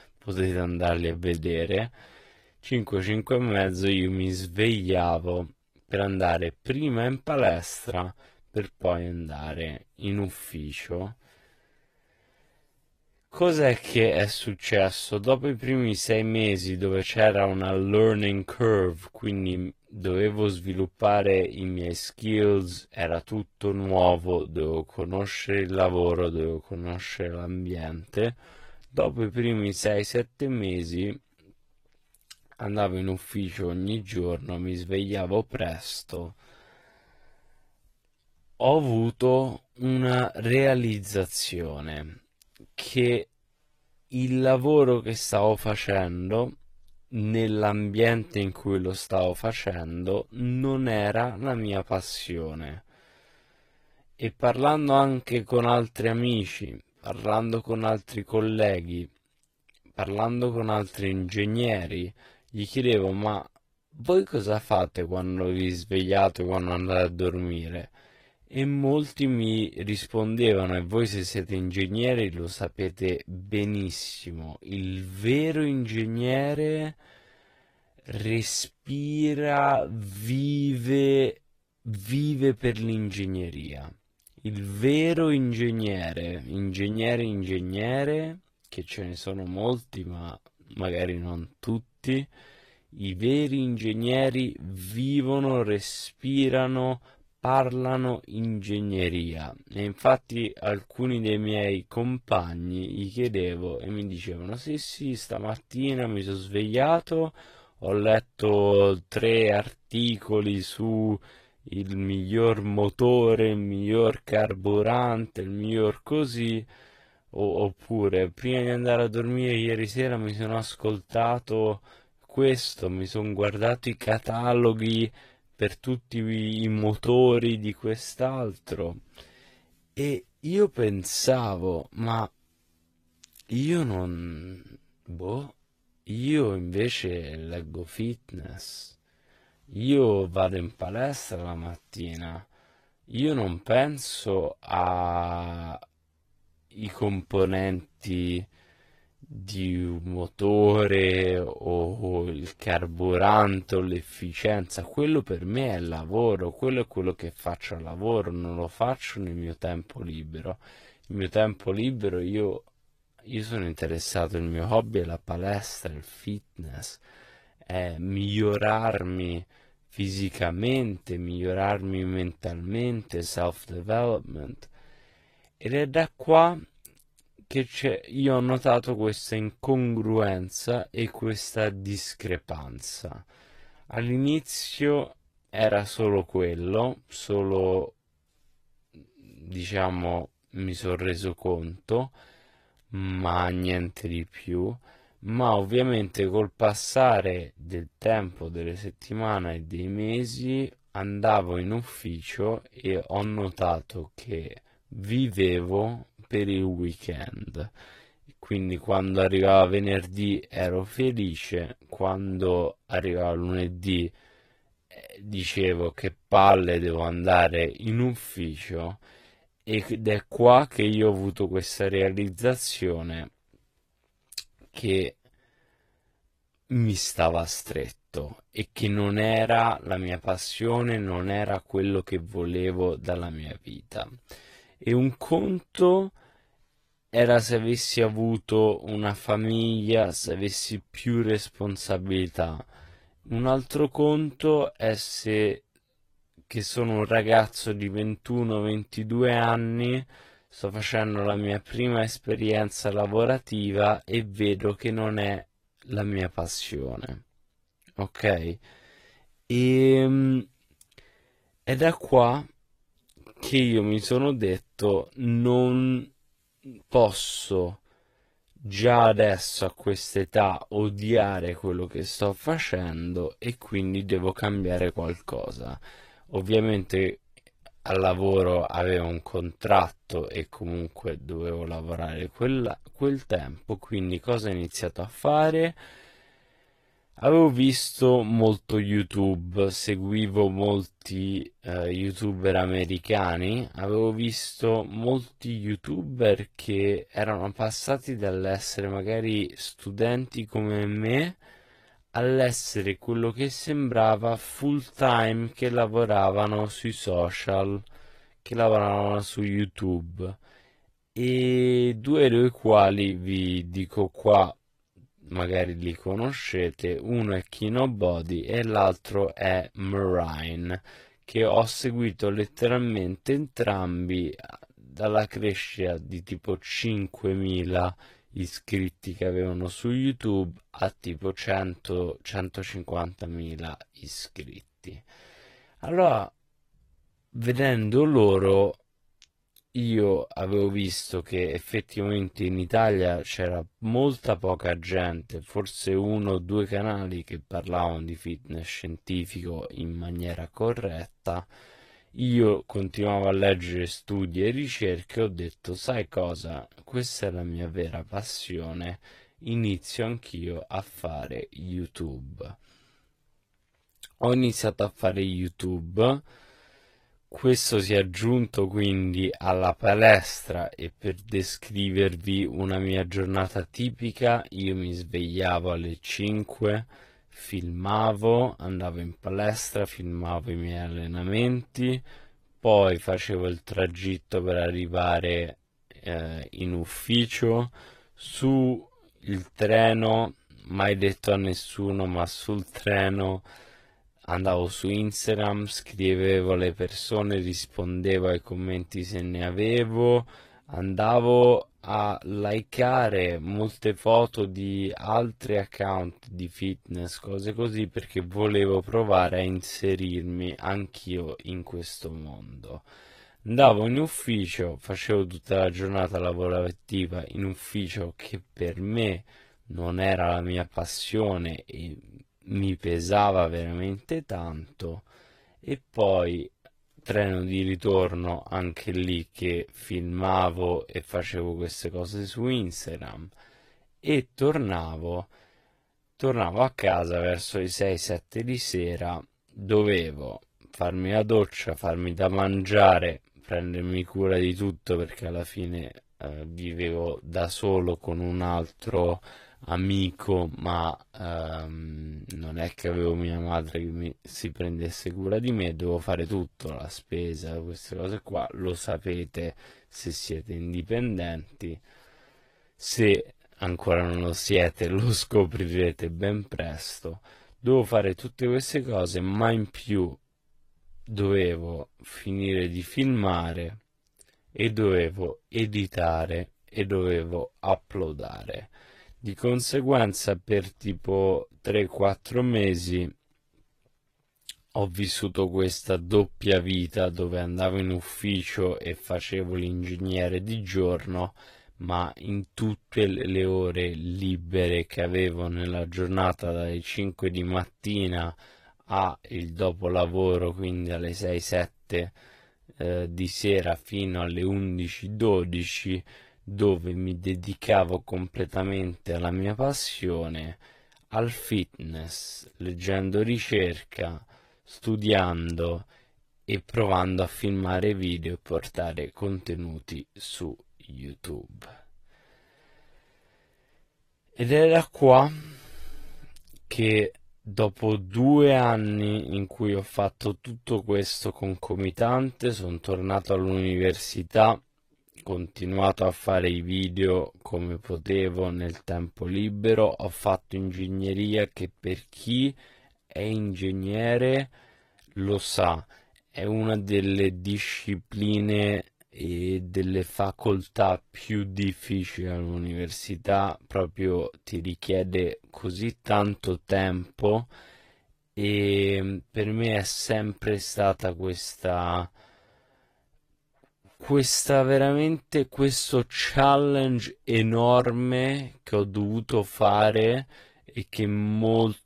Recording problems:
wrong speed, natural pitch; too slow; 0.7 times normal speed
garbled, watery; slightly; nothing above 14.5 kHz

